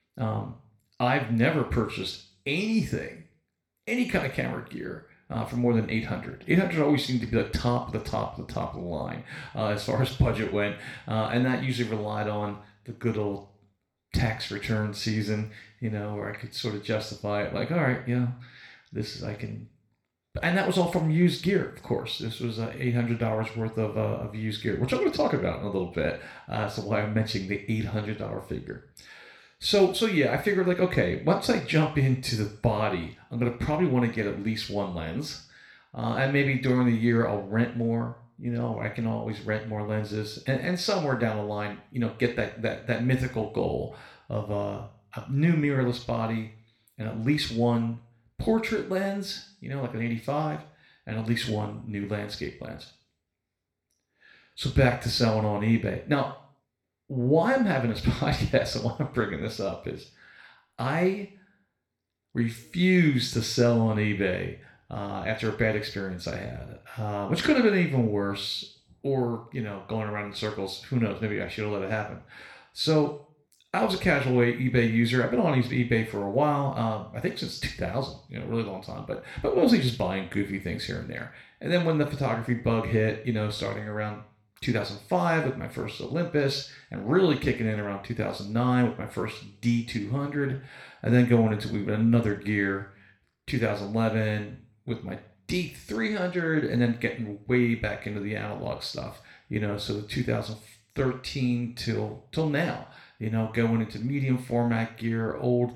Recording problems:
room echo; slight; dies away in 0.4 s
off-mic speech; somewhat distant

